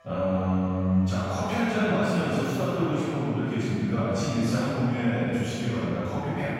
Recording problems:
room echo; strong; dies away in 2.9 s
off-mic speech; far
background chatter; faint; throughout; 4 voices, 30 dB below the speech
background music; very faint; throughout; 25 dB below the speech

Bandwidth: 16.5 kHz